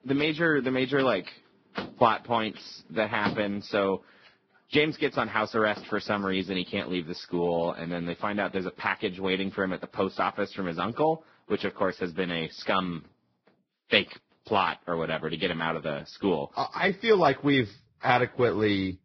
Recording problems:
garbled, watery; badly; nothing above 5.5 kHz
household noises; noticeable; throughout; 15 dB below the speech

